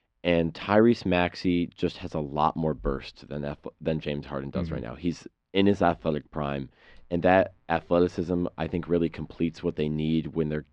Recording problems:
muffled; slightly; fading above 3.5 kHz

